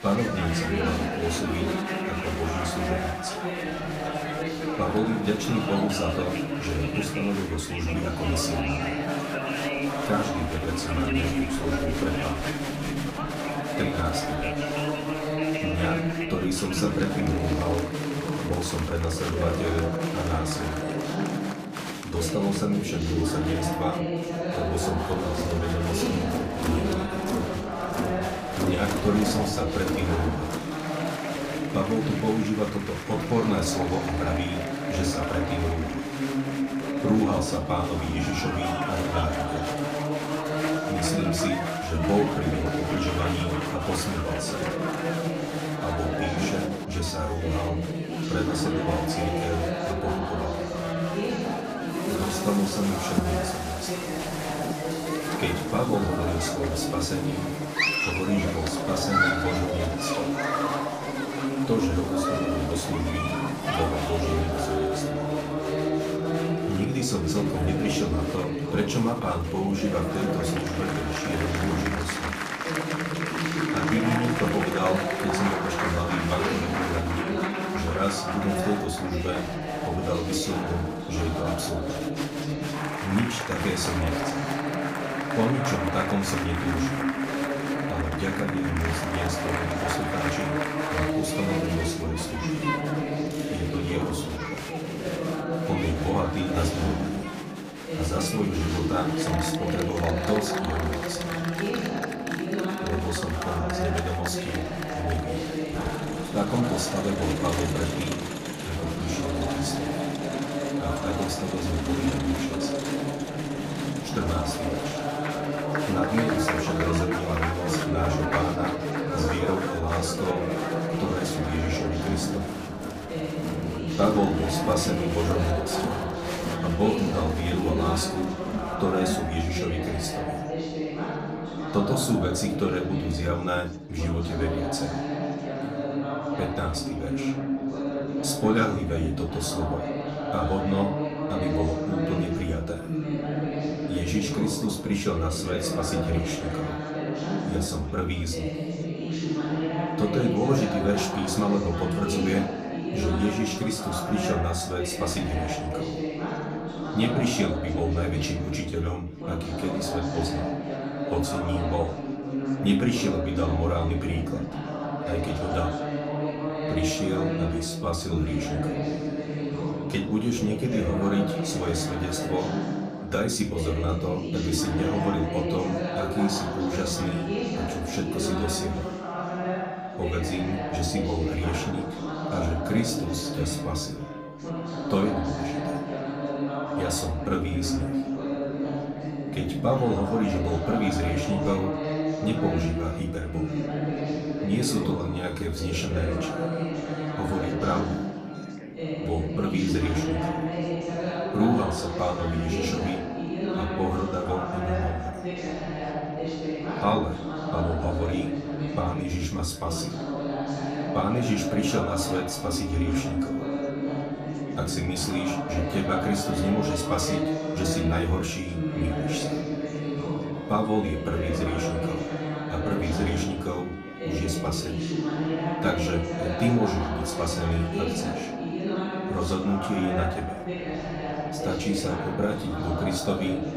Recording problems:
off-mic speech; far
room echo; slight; dies away in 0.3 s
chatter from many people; loud; throughout; as loud as the speech
background music; faint; throughout; 20 dB below the speech

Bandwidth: 15 kHz